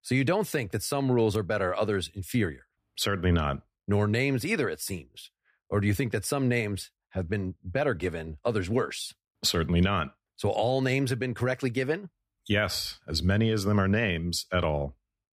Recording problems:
none

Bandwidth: 15 kHz